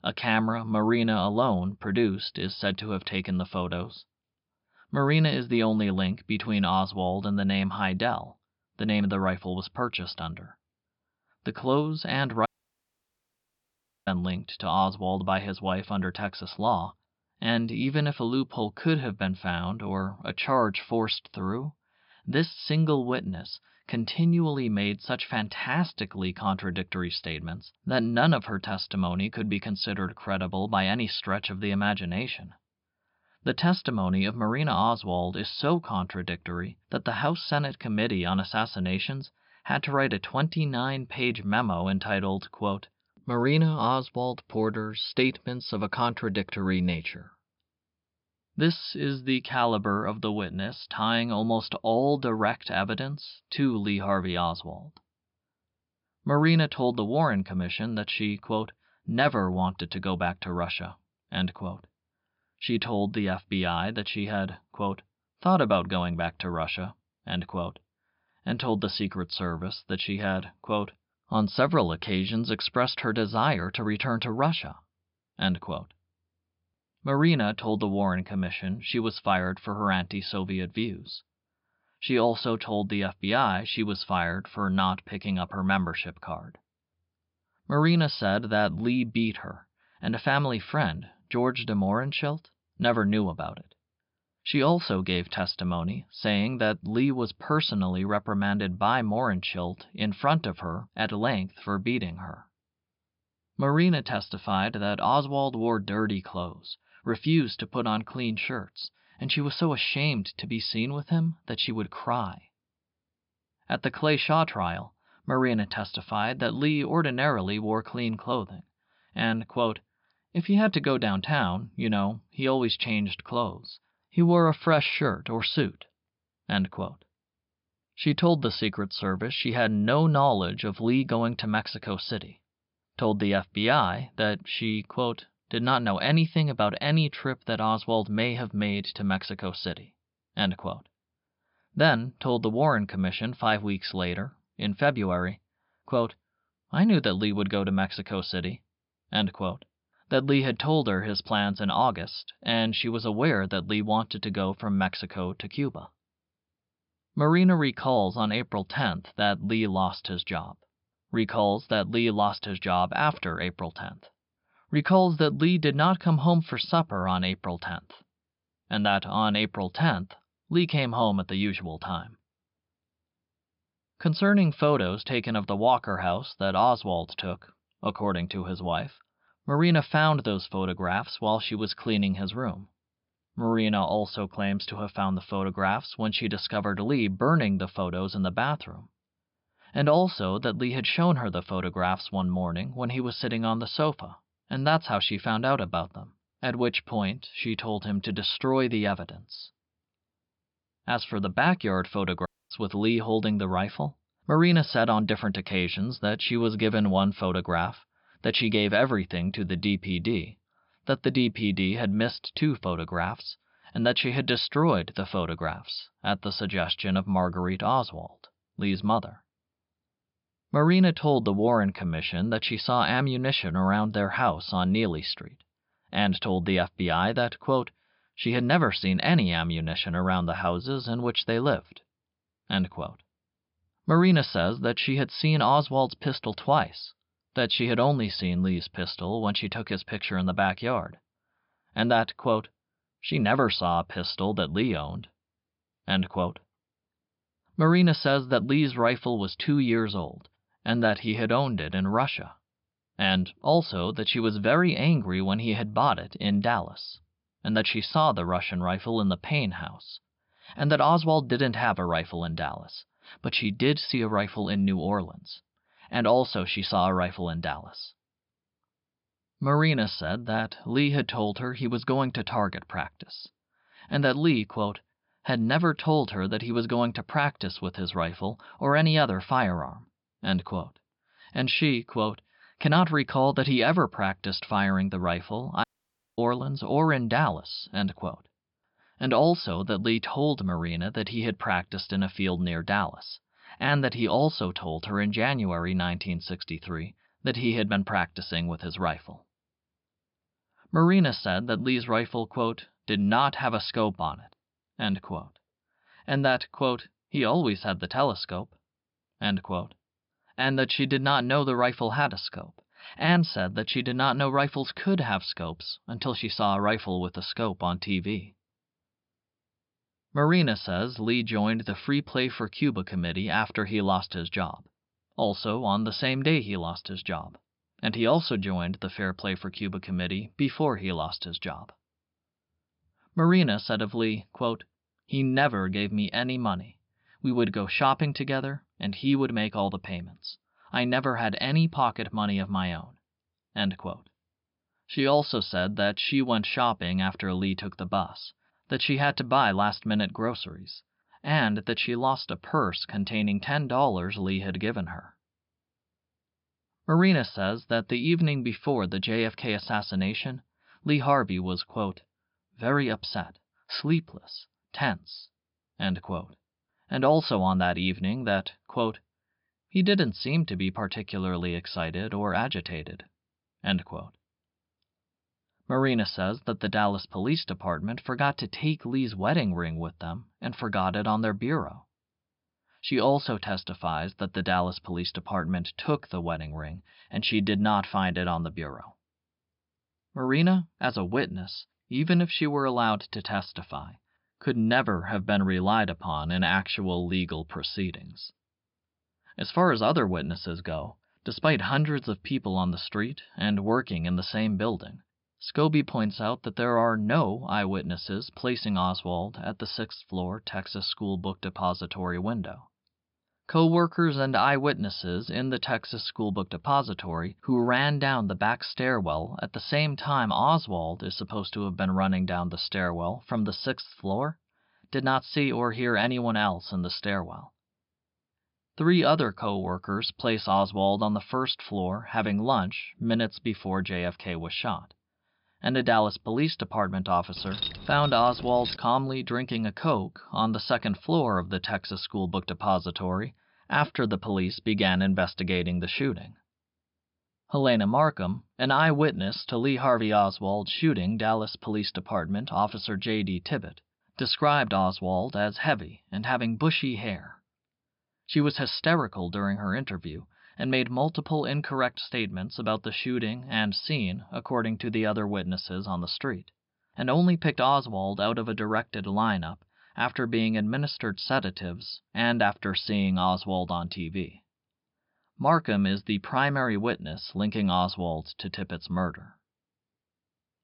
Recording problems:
high frequencies cut off; noticeable; nothing above 5.5 kHz
audio cutting out; at 12 s for 1.5 s, at 3:22 and at 4:46 for 0.5 s
jangling keys; noticeable; from 7:17 to 7:19; peak 5 dB below the speech

